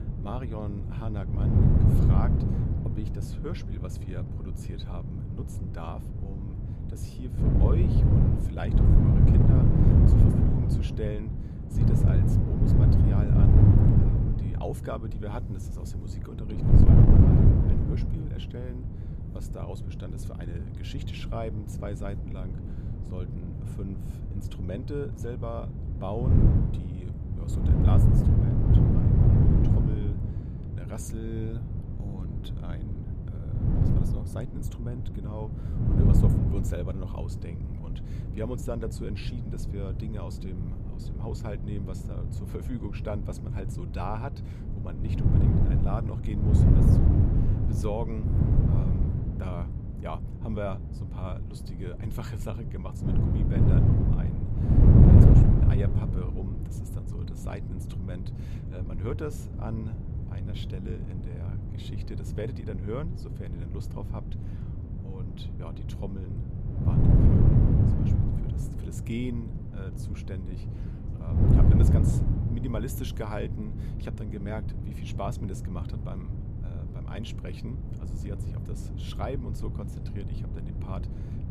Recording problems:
wind noise on the microphone; heavy; 4 dB above the speech

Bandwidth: 14.5 kHz